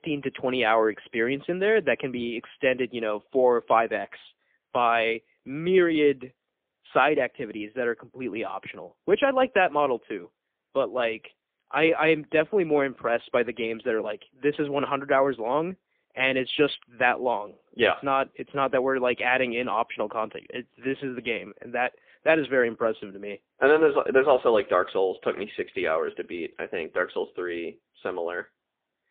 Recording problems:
phone-call audio; poor line

